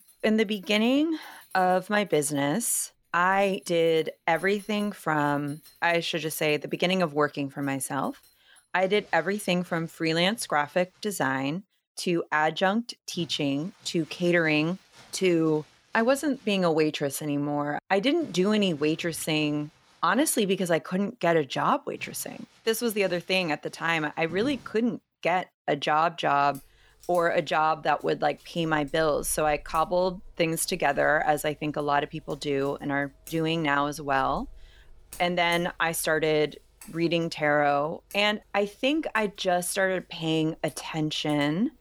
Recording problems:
household noises; faint; throughout; 25 dB below the speech

